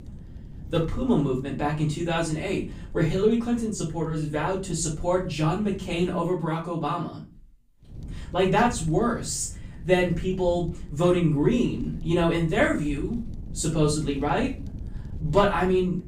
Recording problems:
off-mic speech; far
room echo; slight; dies away in 0.3 s
wind noise on the microphone; occasional gusts; until 6 s and from 8 s on; 25 dB below the speech

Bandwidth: 15.5 kHz